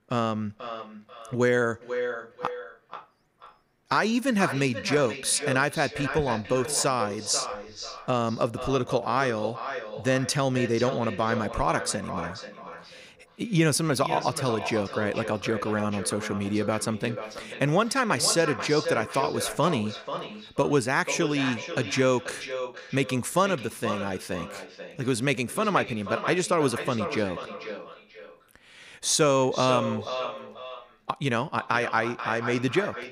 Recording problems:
echo of what is said; strong; throughout; 490 ms later, 9 dB below the speech

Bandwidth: 15.5 kHz